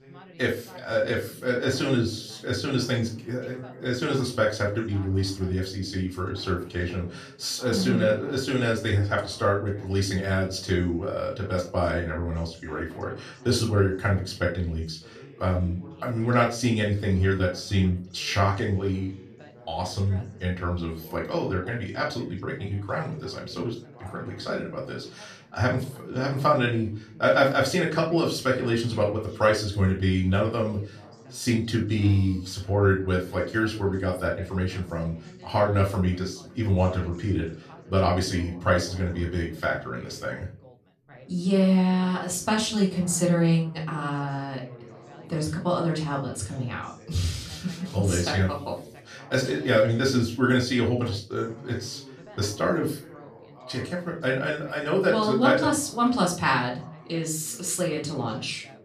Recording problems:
off-mic speech; far
room echo; slight; dies away in 0.3 s
background chatter; faint; throughout; 2 voices, 20 dB below the speech

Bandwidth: 14.5 kHz